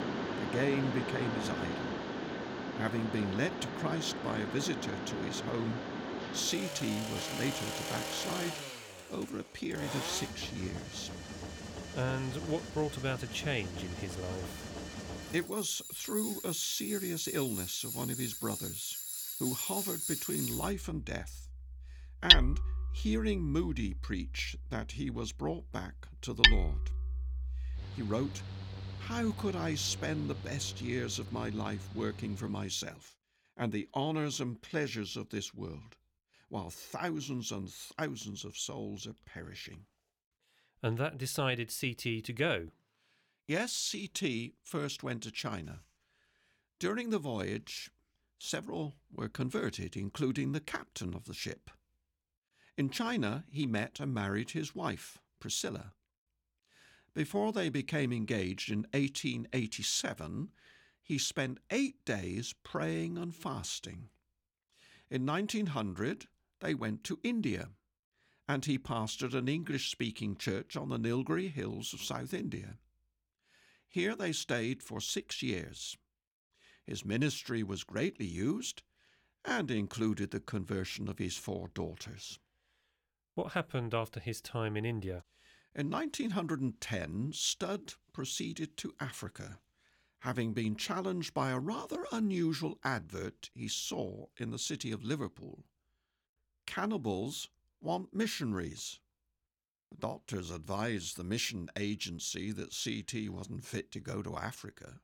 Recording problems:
machinery noise; very loud; until 33 s; 2 dB above the speech

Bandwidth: 17 kHz